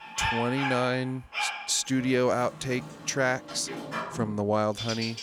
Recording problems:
animal sounds; loud; throughout; 6 dB below the speech

